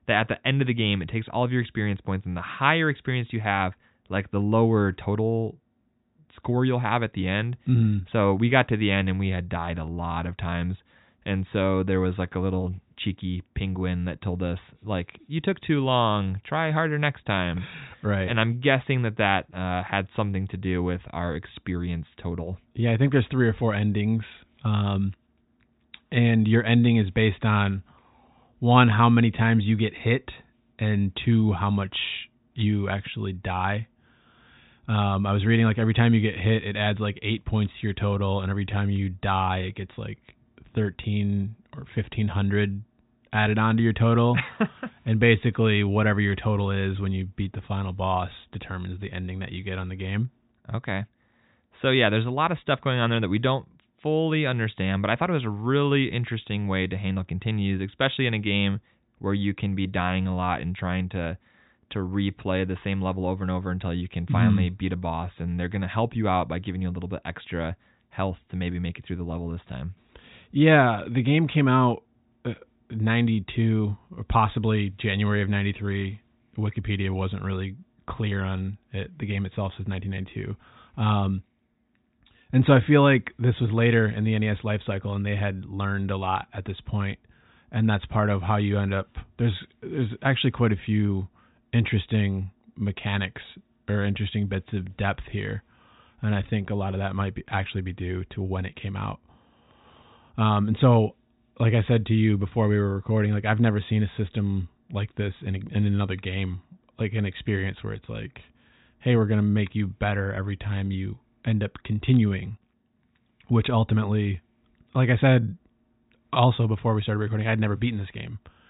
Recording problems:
high frequencies cut off; severe; nothing above 4 kHz

